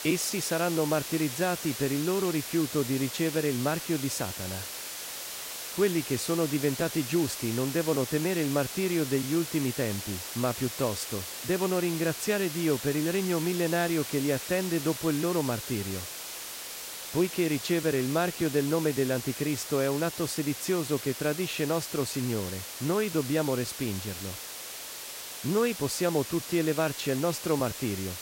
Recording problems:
hiss; loud; throughout; 7 dB below the speech

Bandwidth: 16 kHz